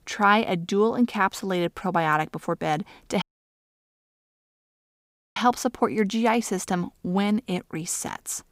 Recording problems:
audio cutting out; at 3 s for 2 s

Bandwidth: 15.5 kHz